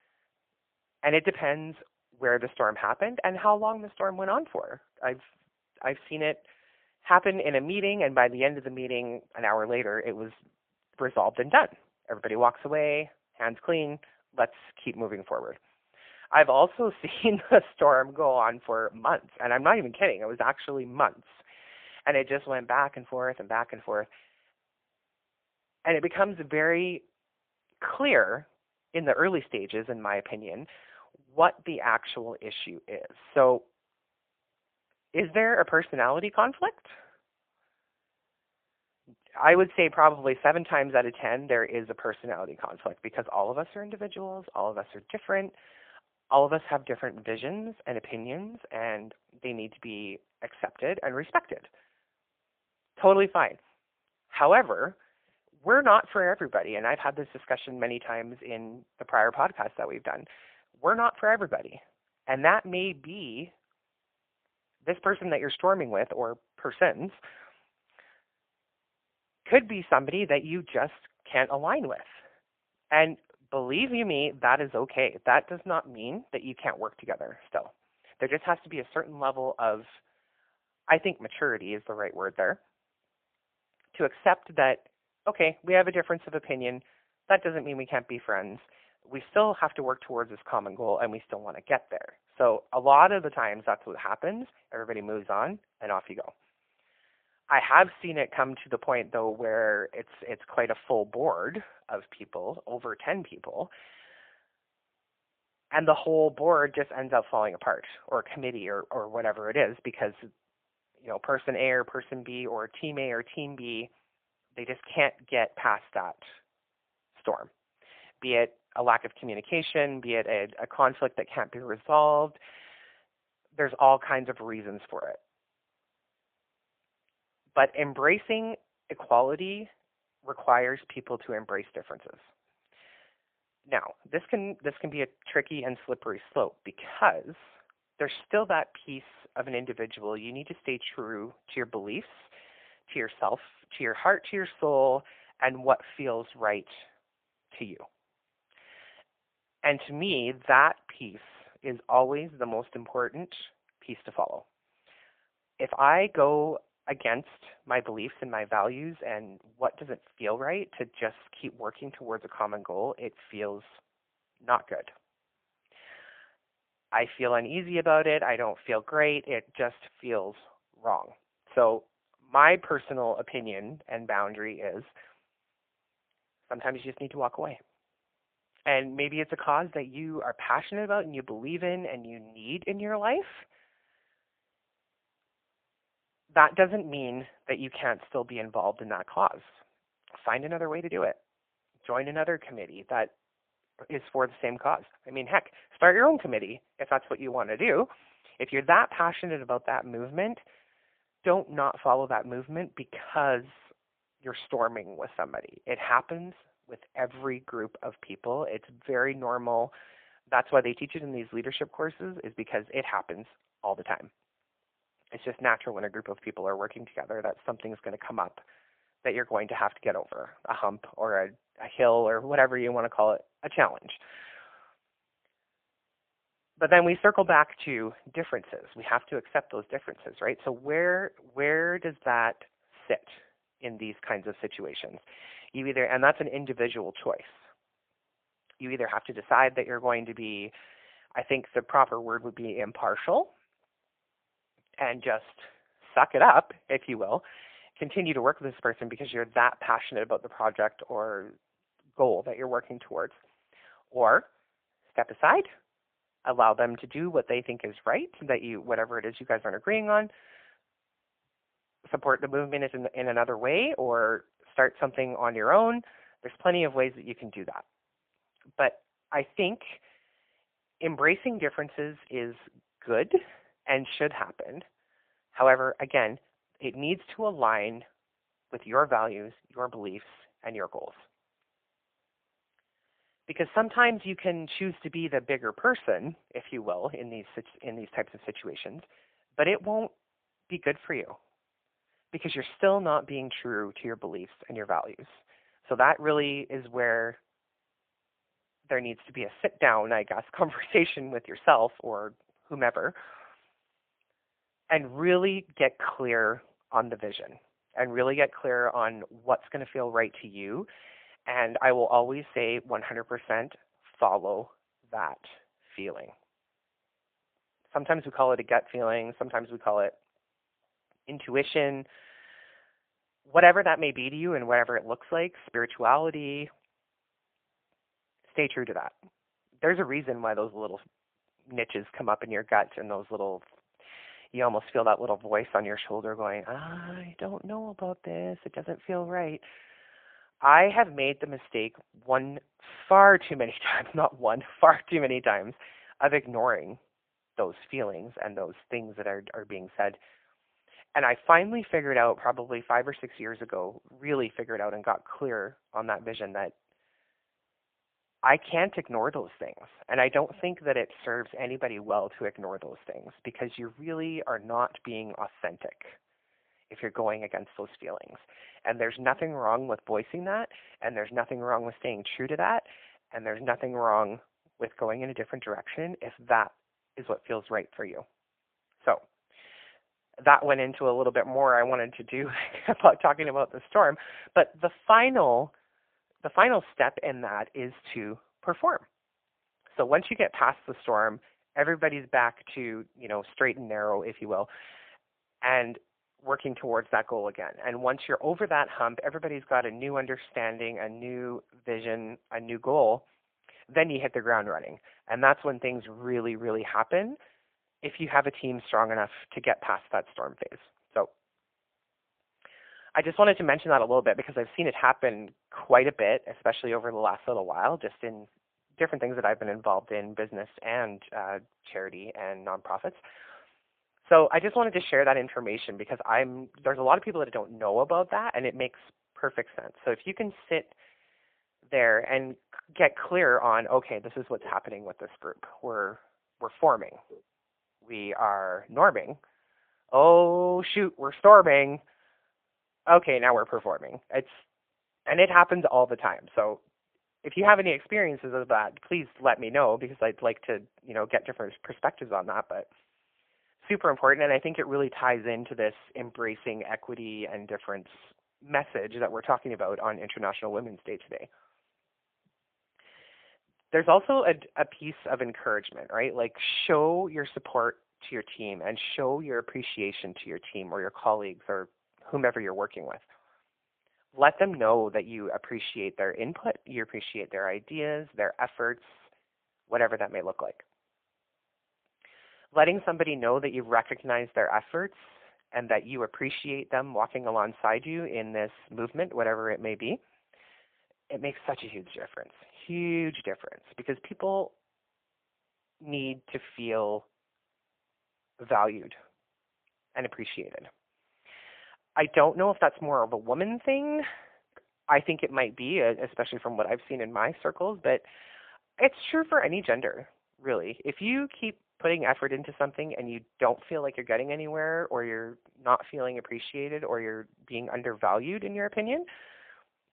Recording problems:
phone-call audio; poor line

